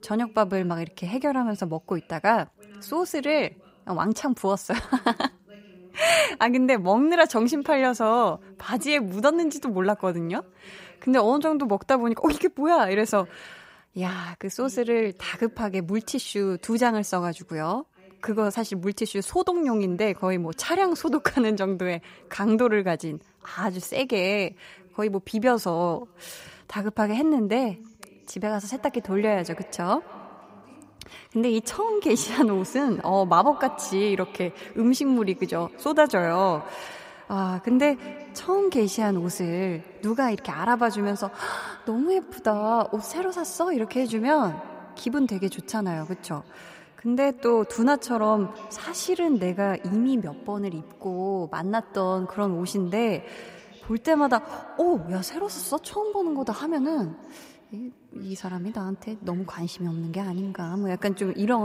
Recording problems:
echo of what is said; faint; from 29 s on; 200 ms later, 20 dB below the speech
voice in the background; faint; throughout; 25 dB below the speech
abrupt cut into speech; at the end

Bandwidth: 15.5 kHz